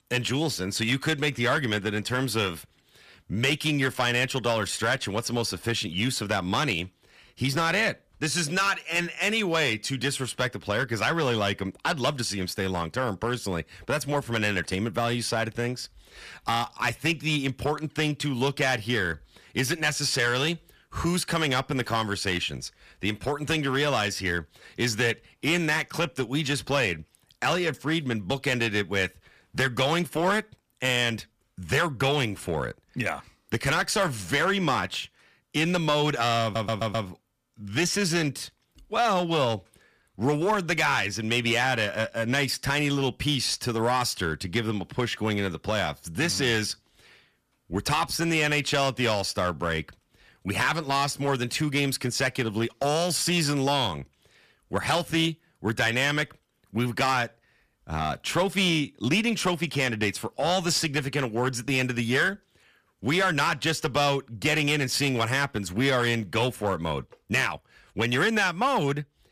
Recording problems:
distortion; slight; 4% of the sound clipped
audio stuttering; at 36 s

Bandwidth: 14.5 kHz